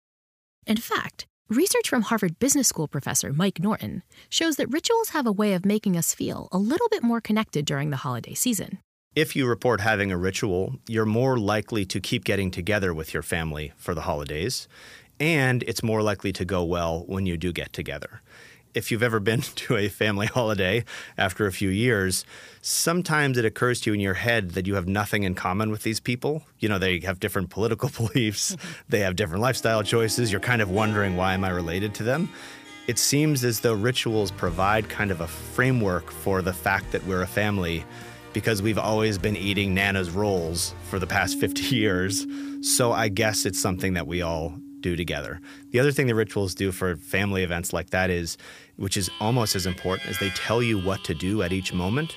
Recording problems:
background music; noticeable; from 30 s on; 15 dB below the speech

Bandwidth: 15 kHz